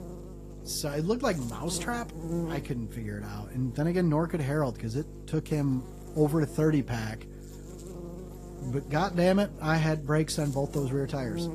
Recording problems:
garbled, watery; slightly; nothing above 14.5 kHz
electrical hum; noticeable; throughout; 50 Hz, 15 dB below the speech

